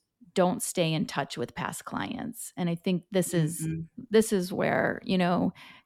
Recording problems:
none

